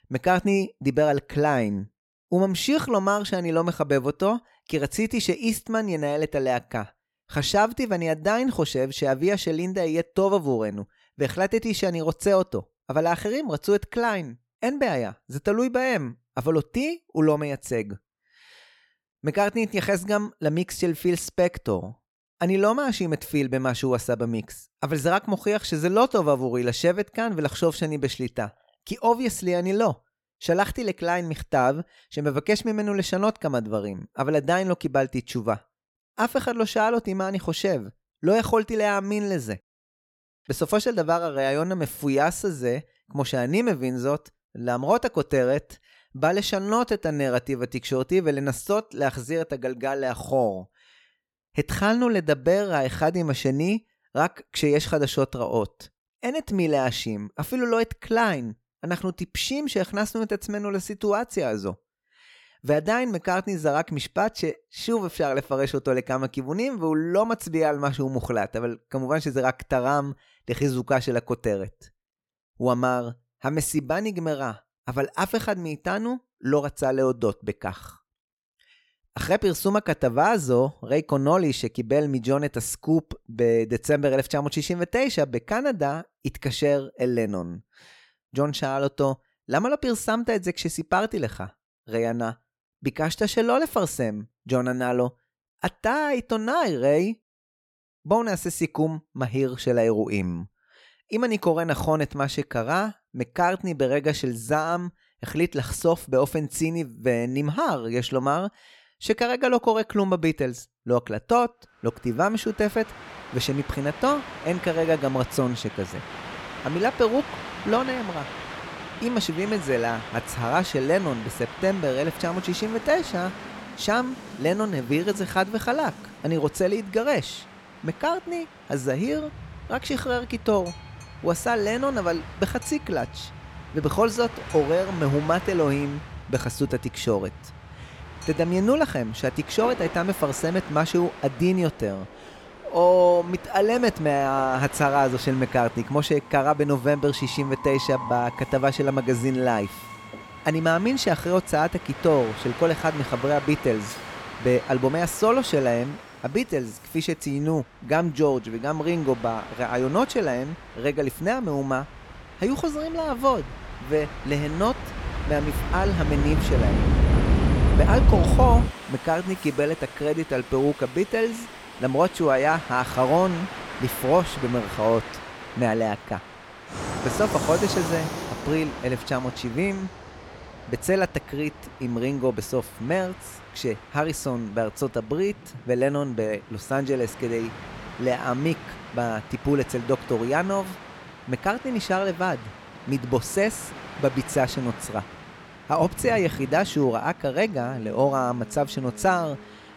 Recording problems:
train or aircraft noise; loud; from 1:52 on; 8 dB below the speech

